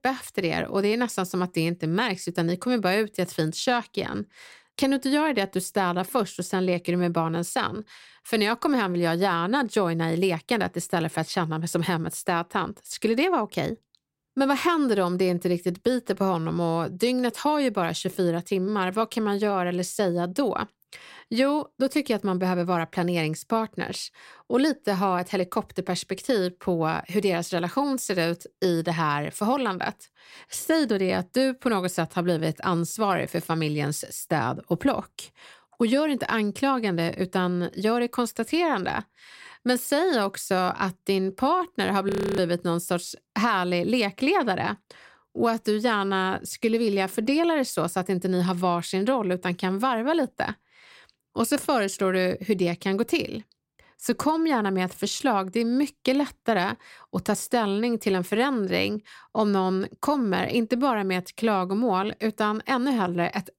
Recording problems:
audio freezing; at 42 s

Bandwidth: 16 kHz